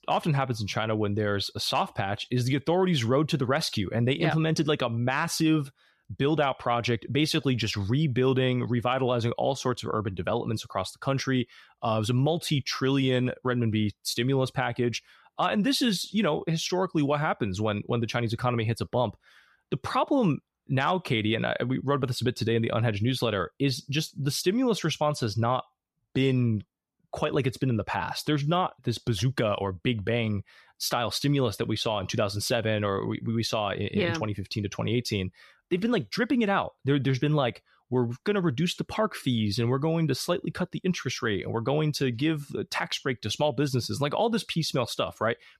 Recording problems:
none

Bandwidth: 14 kHz